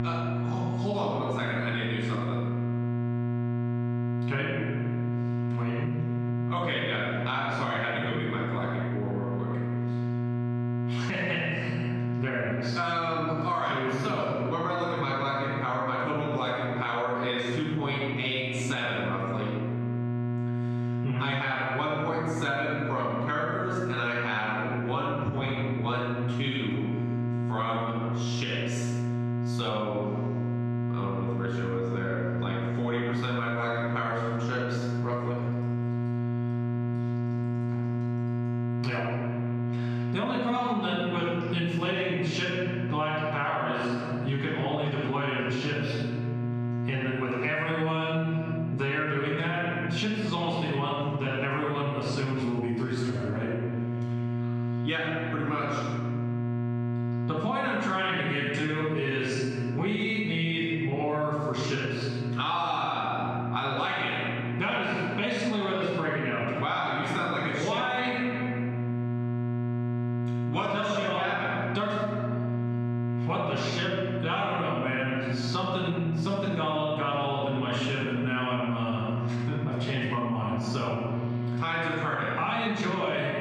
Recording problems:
room echo; strong; dies away in 1.2 s
off-mic speech; far
squashed, flat; heavily
muffled; very slightly; fading above 3.5 kHz
electrical hum; noticeable; throughout; 60 Hz, 10 dB below the speech

